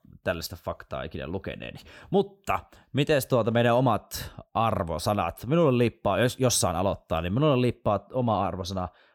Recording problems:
none

